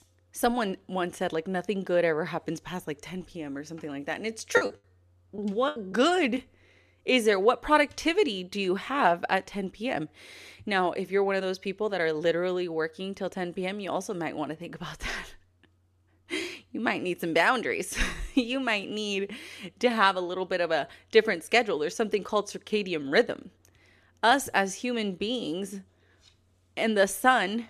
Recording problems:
choppy; very; from 4.5 to 6 s; 13% of the speech affected

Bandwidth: 14 kHz